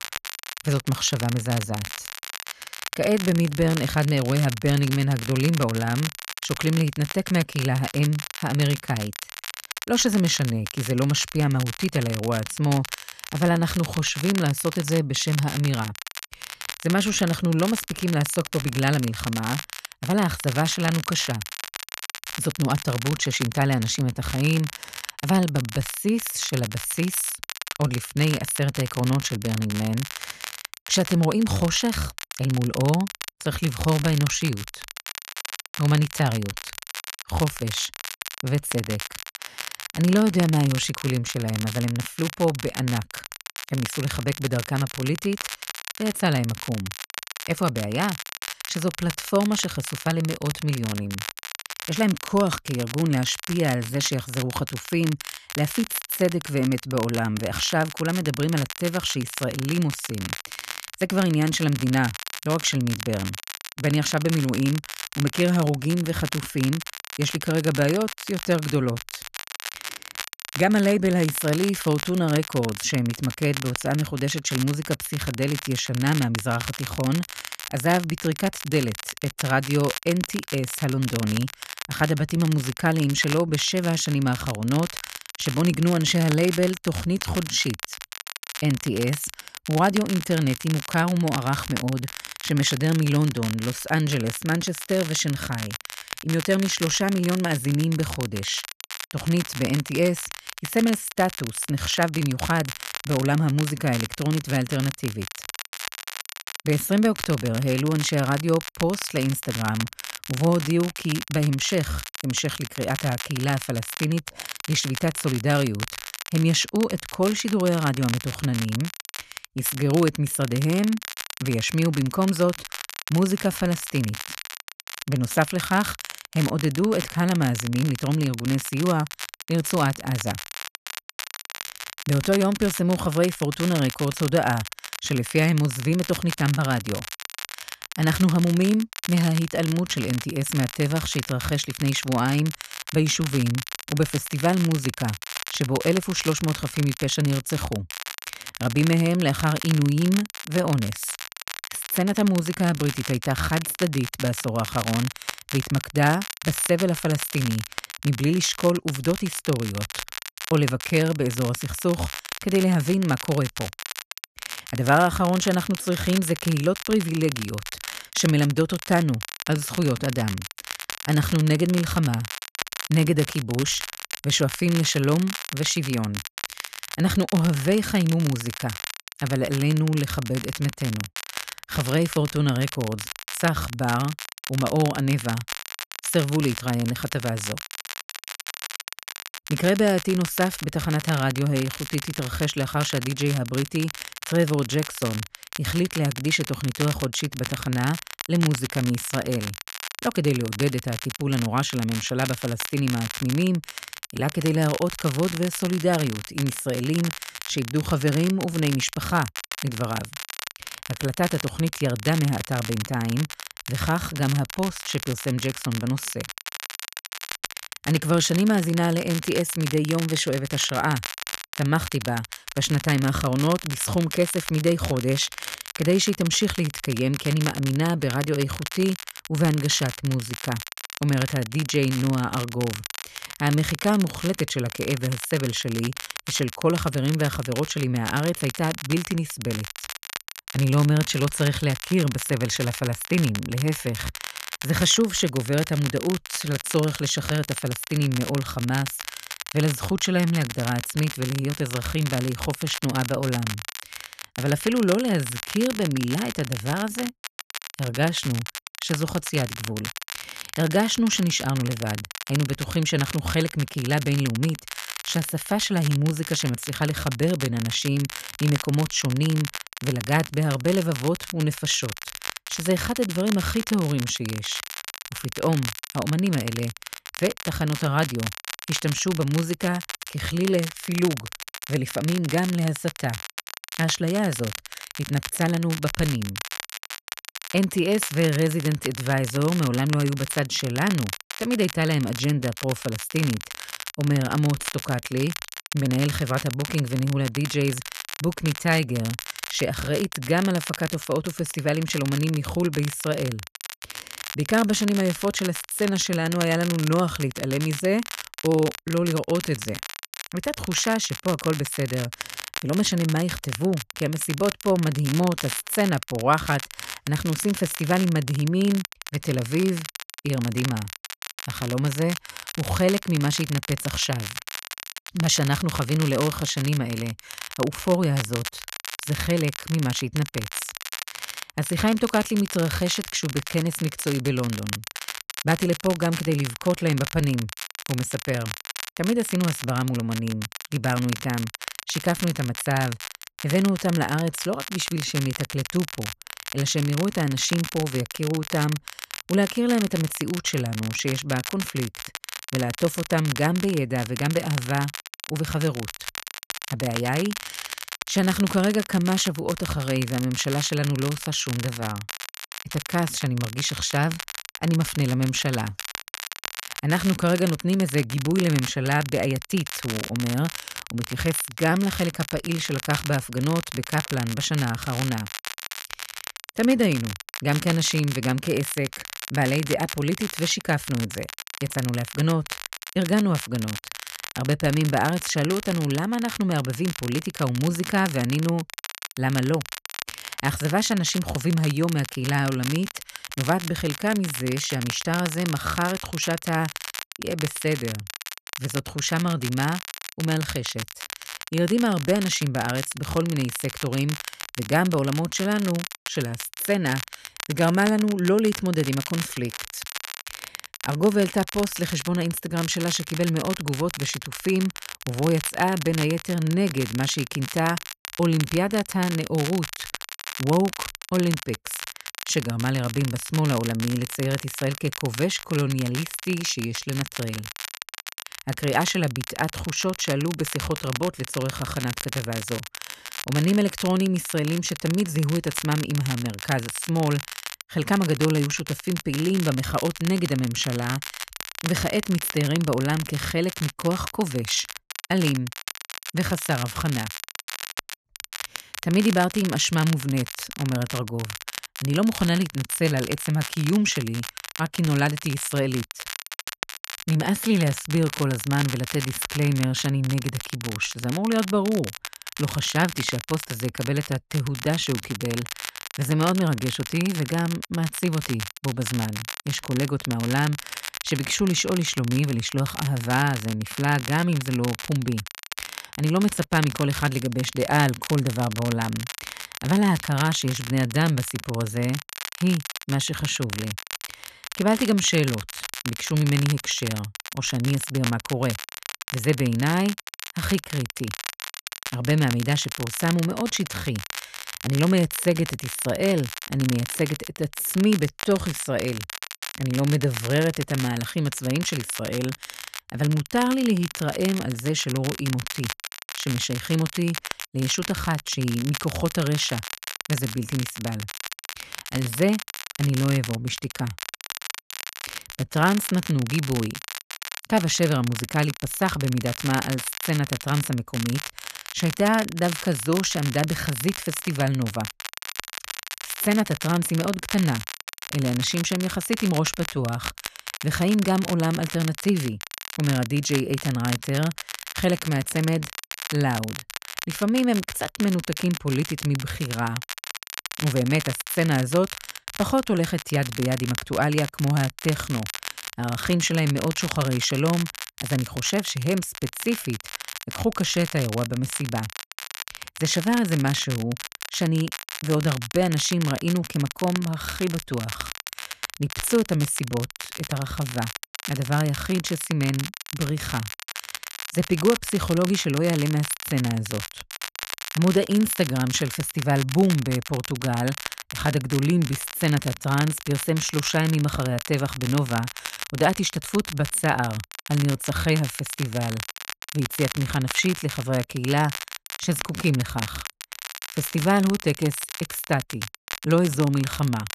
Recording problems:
crackle, like an old record; loud; 9 dB below the speech

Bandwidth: 14 kHz